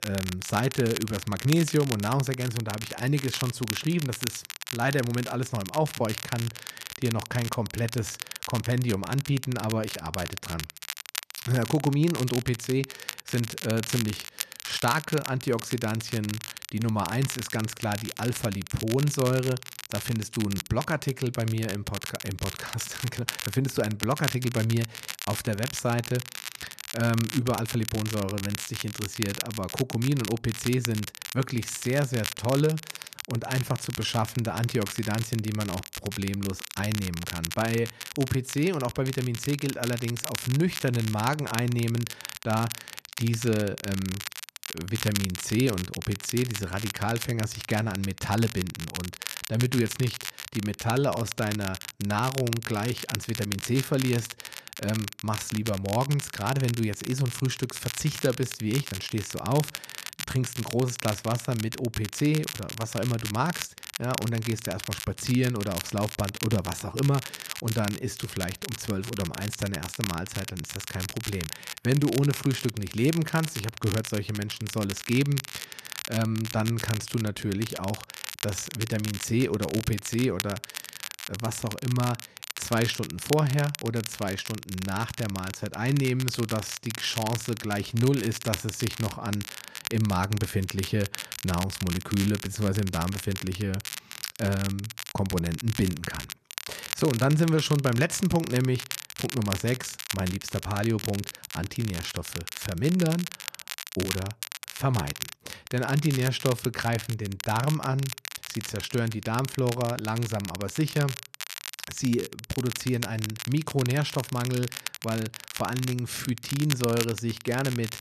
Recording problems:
crackle, like an old record; loud; 8 dB below the speech

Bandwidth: 14 kHz